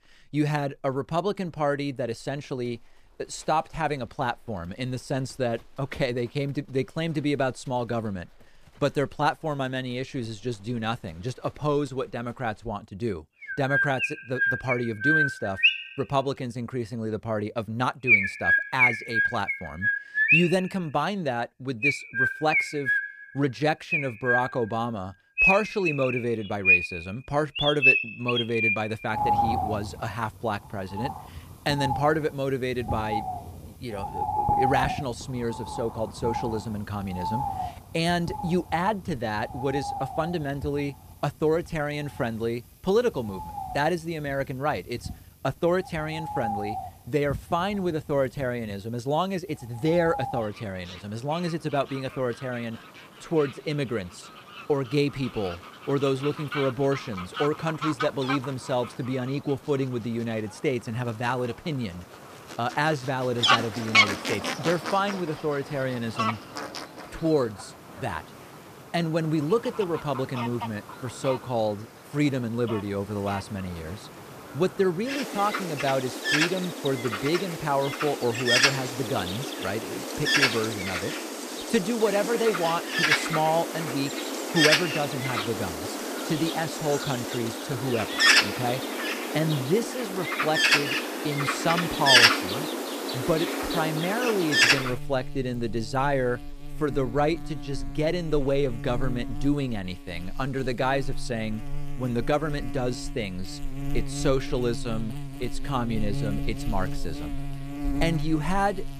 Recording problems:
animal sounds; very loud; throughout; 3 dB above the speech

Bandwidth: 14.5 kHz